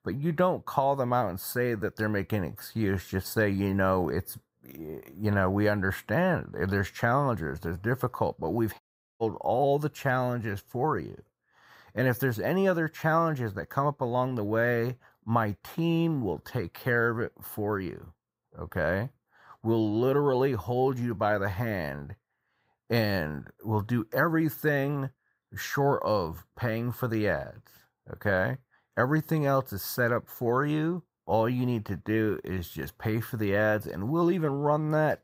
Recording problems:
audio cutting out; at 9 s

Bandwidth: 15.5 kHz